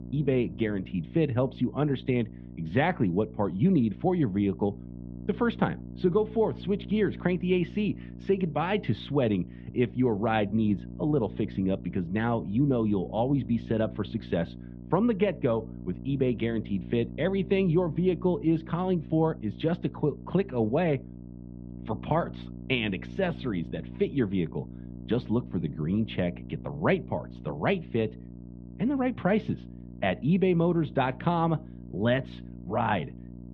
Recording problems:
muffled; very; fading above 3.5 kHz
electrical hum; noticeable; throughout; 60 Hz, 20 dB below the speech

